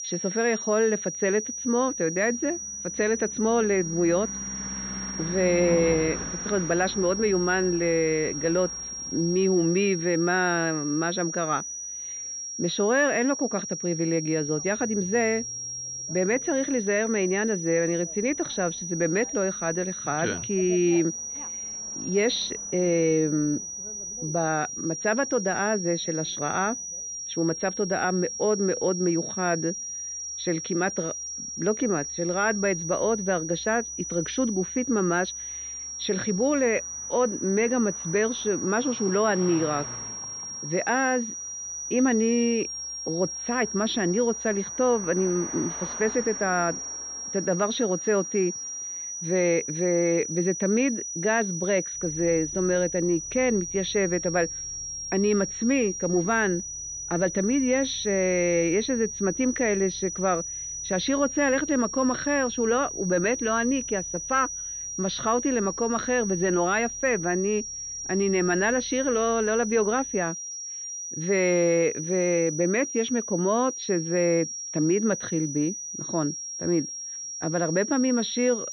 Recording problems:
muffled; very slightly; fading above 4 kHz
high-pitched whine; loud; throughout; 6 kHz, 6 dB below the speech
traffic noise; faint; throughout; 20 dB below the speech

